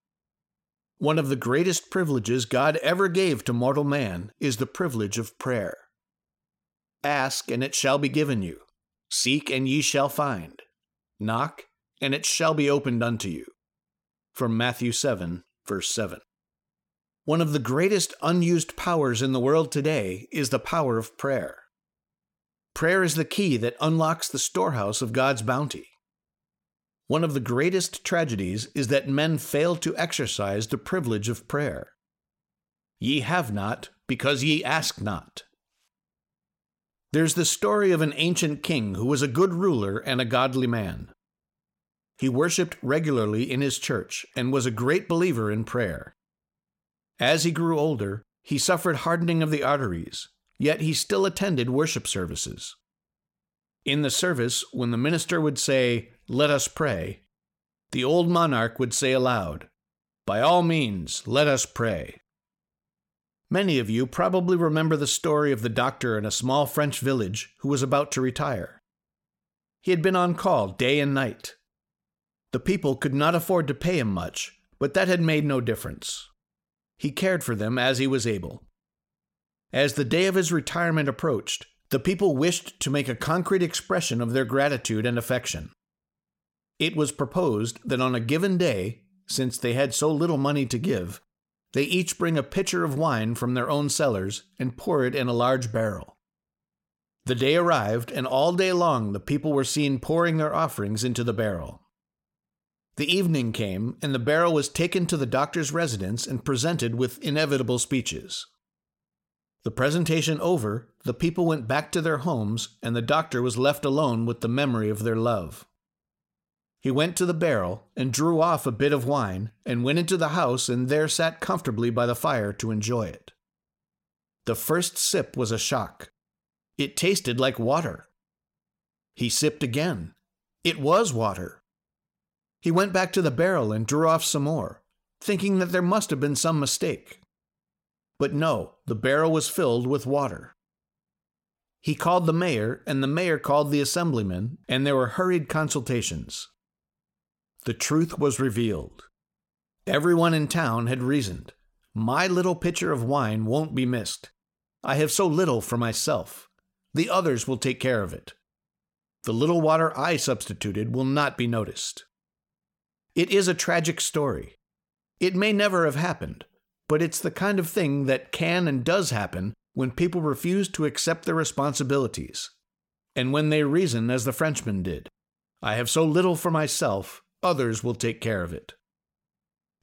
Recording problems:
none

